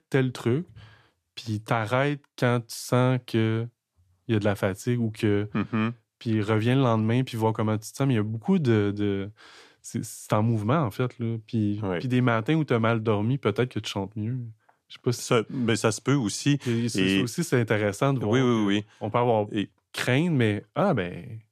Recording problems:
none

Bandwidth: 14.5 kHz